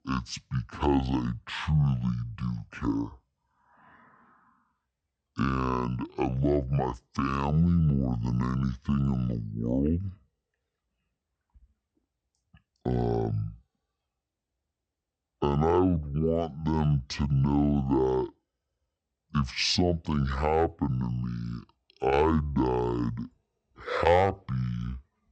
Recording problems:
wrong speed and pitch; too slow and too low; 0.6 times normal speed

